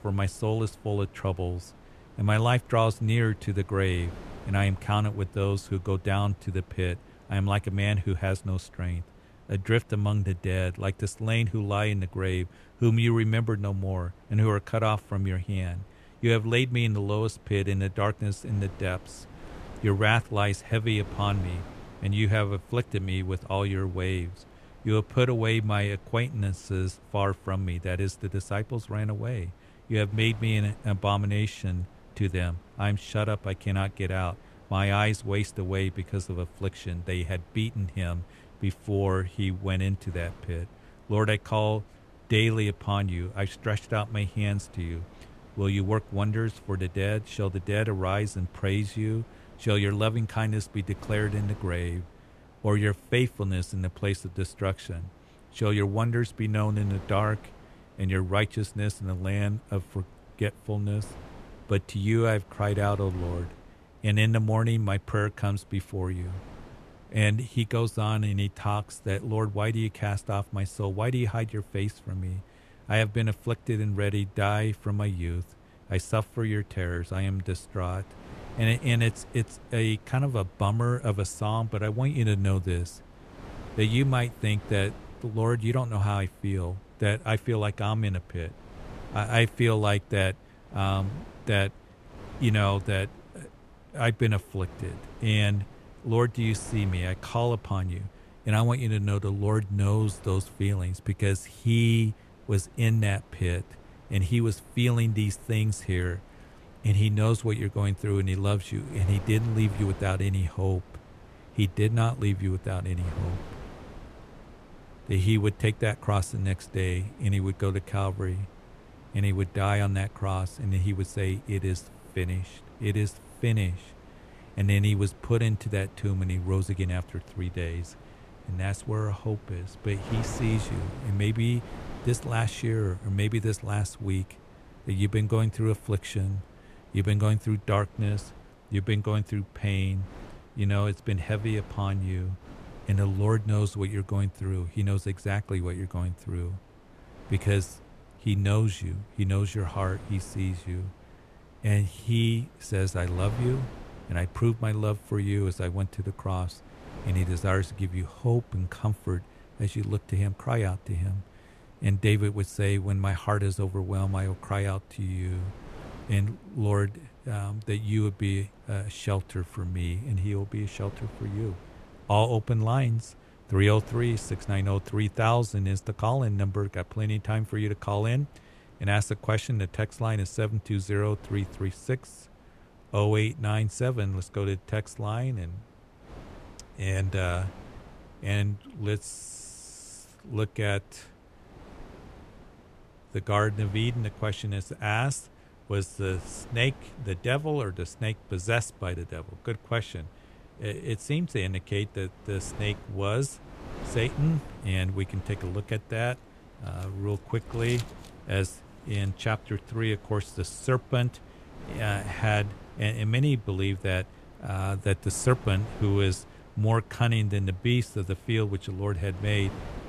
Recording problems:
wind noise on the microphone; occasional gusts; 20 dB below the speech

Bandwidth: 13.5 kHz